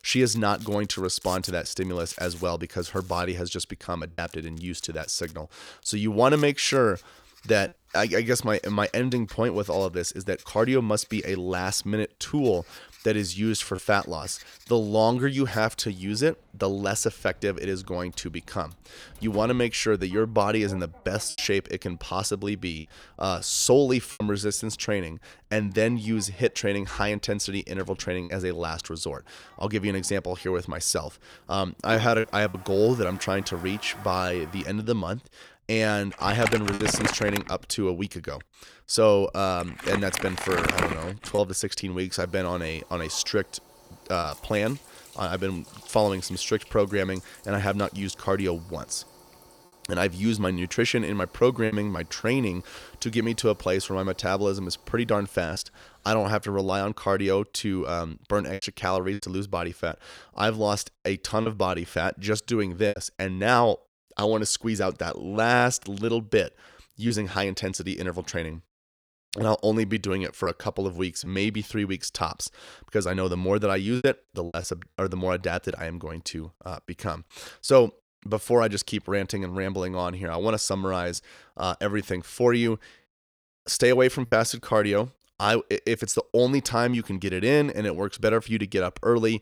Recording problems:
household noises; noticeable; until 56 s; 10 dB below the speech
choppy; occasionally; 2% of the speech affected

